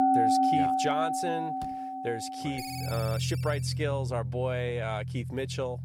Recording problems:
background music; very loud; throughout; 3 dB above the speech
door banging; faint; at 1.5 s; peak 15 dB below the speech
phone ringing; noticeable; from 2.5 to 3.5 s; peak 6 dB below the speech

